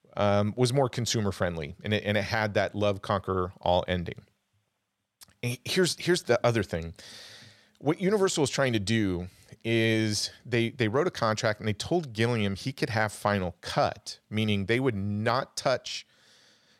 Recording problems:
none

